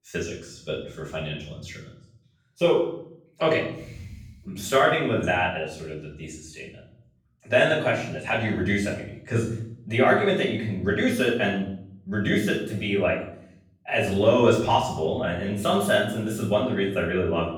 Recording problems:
off-mic speech; far
room echo; noticeable; dies away in 0.6 s

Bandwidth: 18 kHz